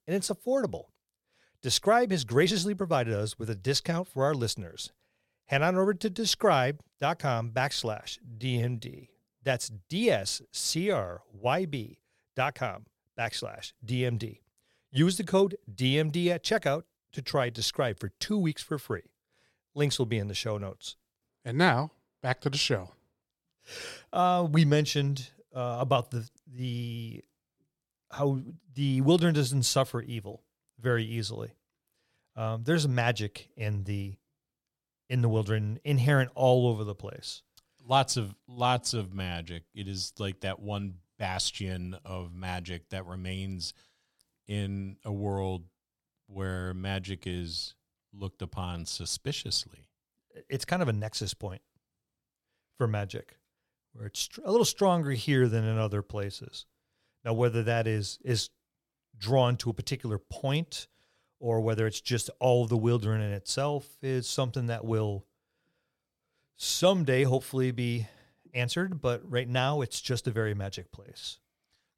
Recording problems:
uneven, jittery; strongly; from 2 to 39 s

